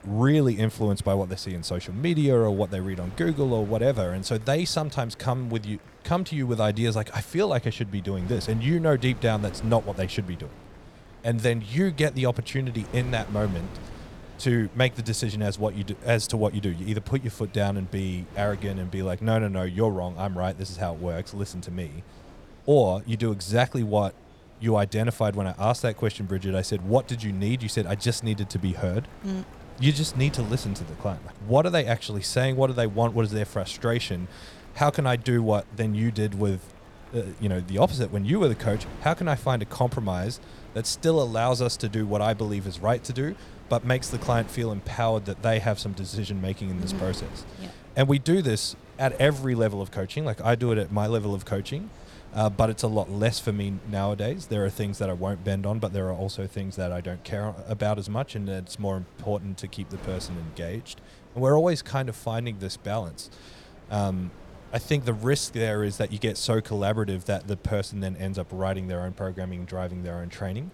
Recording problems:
wind noise on the microphone; occasional gusts; 20 dB below the speech
murmuring crowd; faint; throughout; 30 dB below the speech

